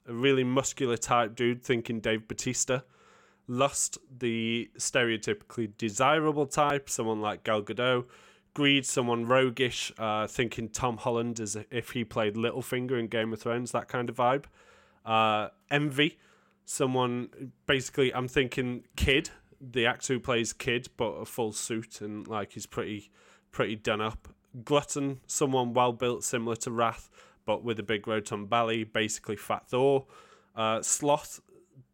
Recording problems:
none

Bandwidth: 16.5 kHz